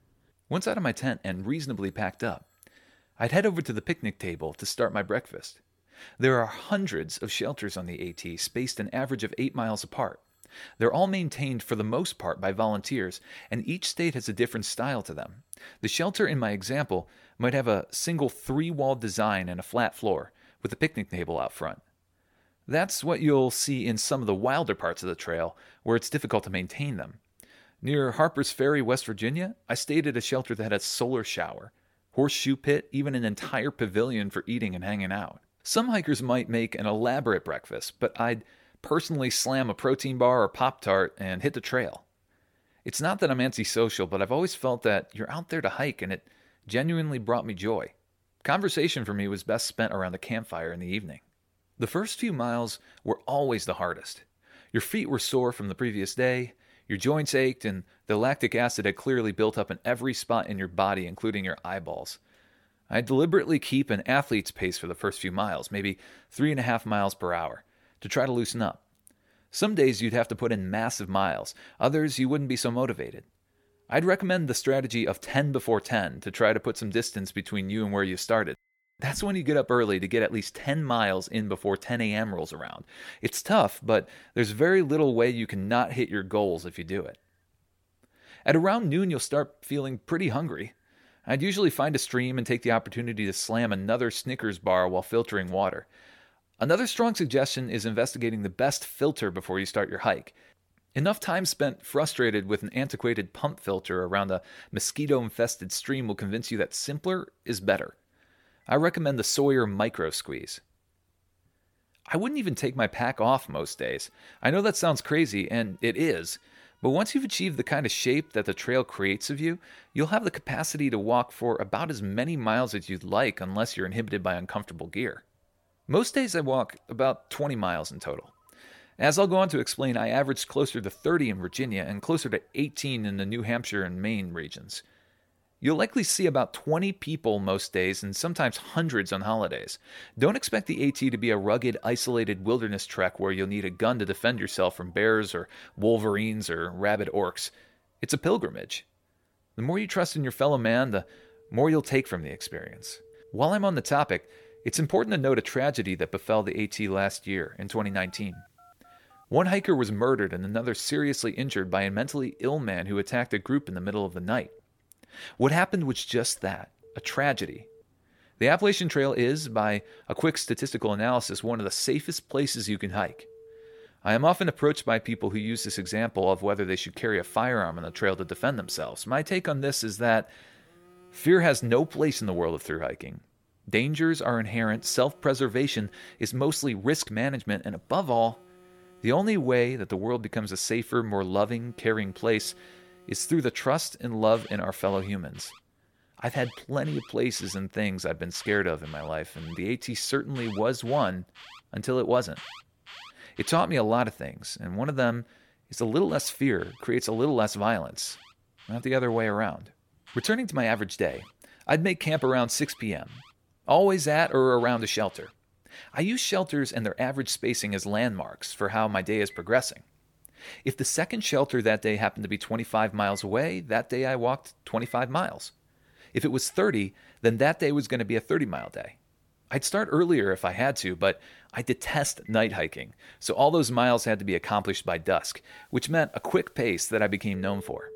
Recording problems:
alarms or sirens; faint; throughout; 25 dB below the speech

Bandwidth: 17.5 kHz